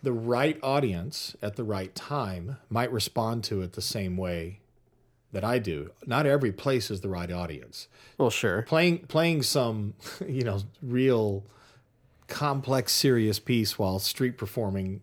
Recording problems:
none

